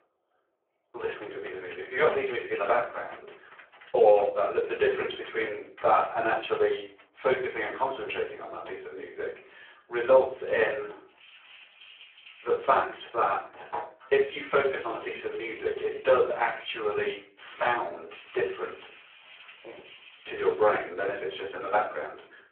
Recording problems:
phone-call audio; poor line
off-mic speech; far
room echo; slight; dies away in 0.4 s
household noises; faint; throughout; 25 dB below the speech

